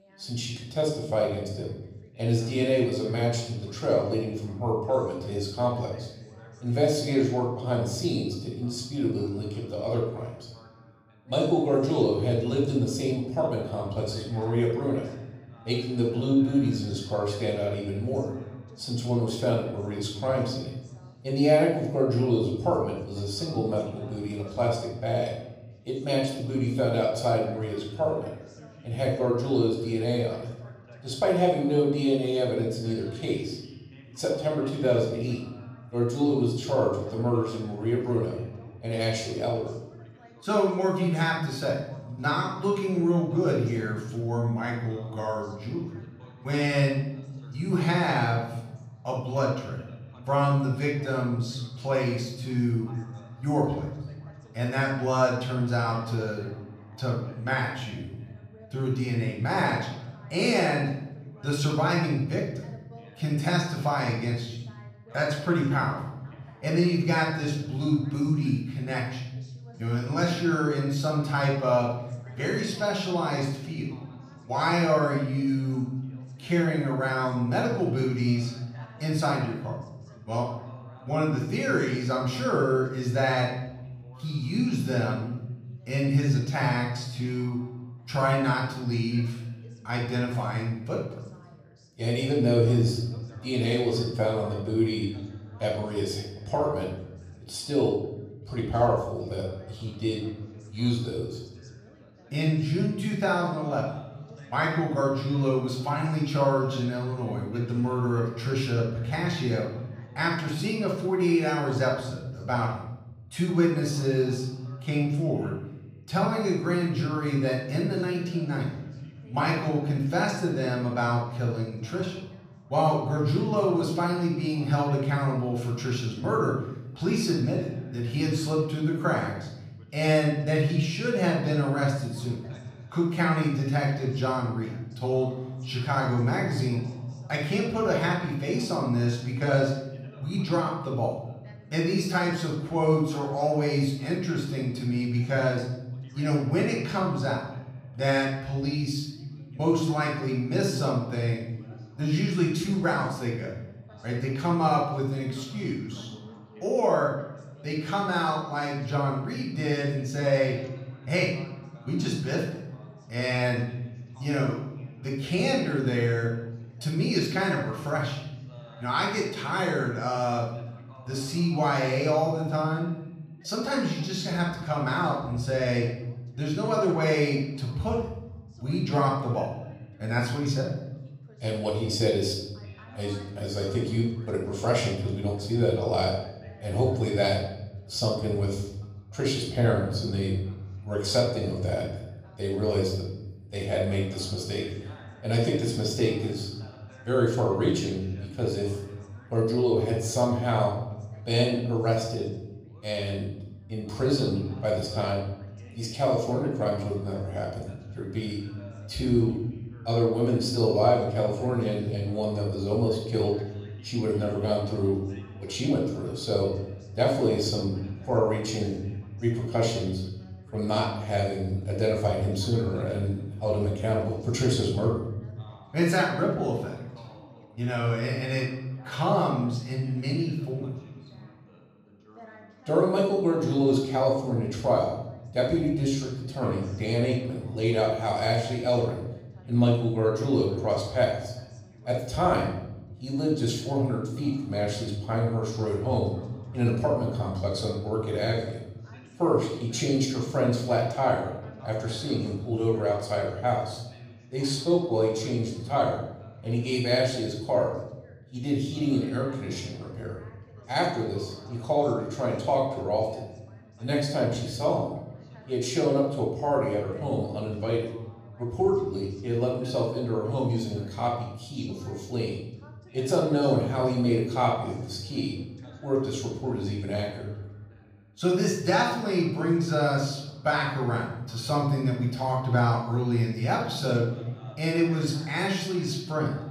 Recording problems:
off-mic speech; far
room echo; noticeable; dies away in 0.9 s
background chatter; faint; throughout; 2 voices, 25 dB below the speech

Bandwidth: 15.5 kHz